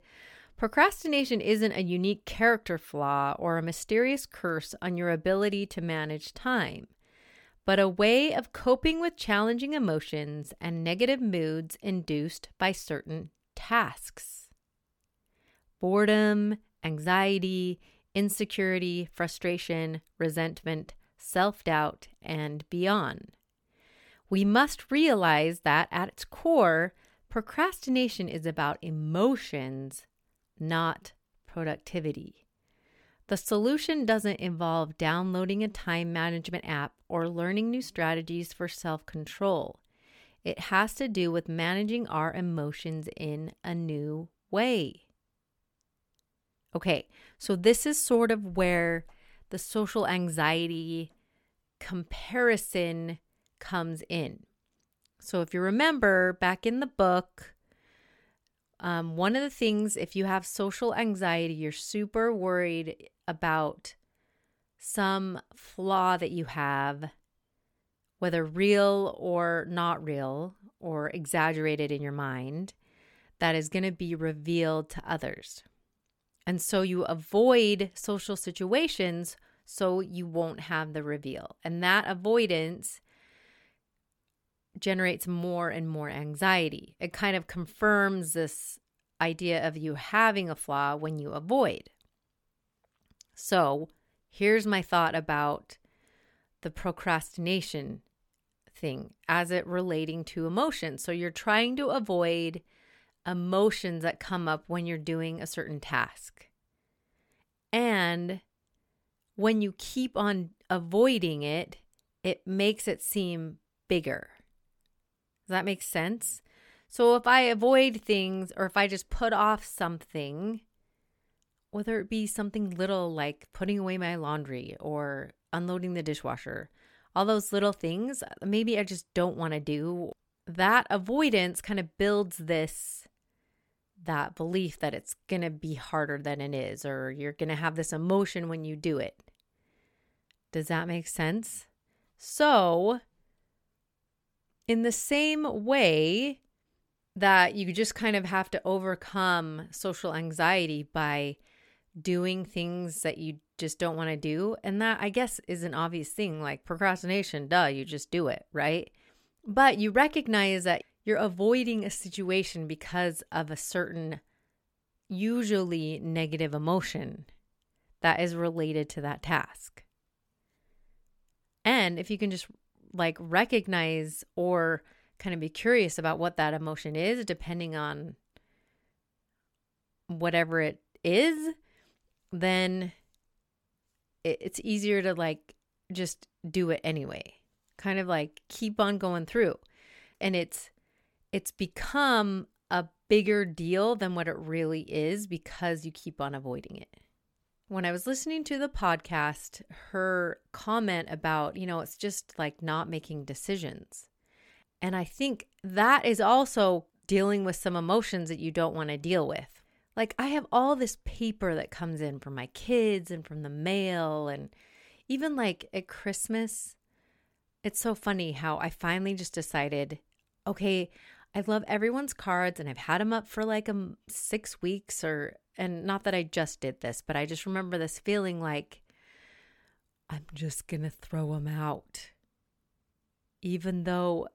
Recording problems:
none

